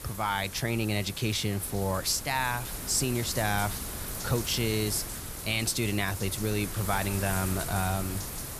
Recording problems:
wind noise on the microphone; heavy; 9 dB below the speech

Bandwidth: 14.5 kHz